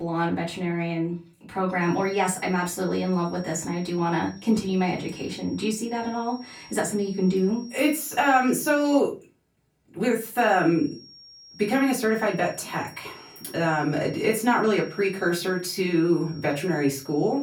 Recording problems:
off-mic speech; far
room echo; very slight; dies away in 0.3 s
high-pitched whine; faint; from 2 to 9 s and from 10 s on; 5.5 kHz, 20 dB below the speech
abrupt cut into speech; at the start

